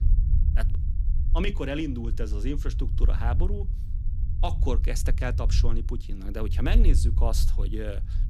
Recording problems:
low rumble; noticeable; throughout; 10 dB below the speech

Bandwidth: 14.5 kHz